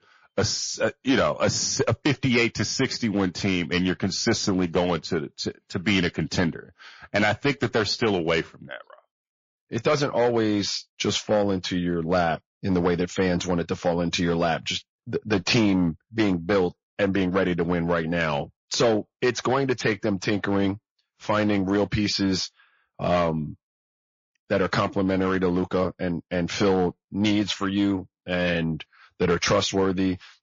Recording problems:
distortion; slight; 4% of the sound clipped
garbled, watery; slightly; nothing above 6.5 kHz

